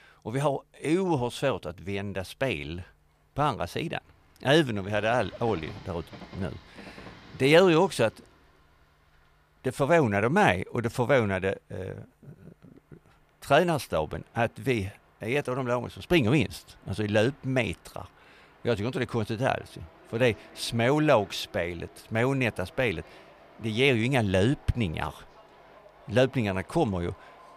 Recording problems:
train or aircraft noise; faint; throughout; 25 dB below the speech

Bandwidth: 15 kHz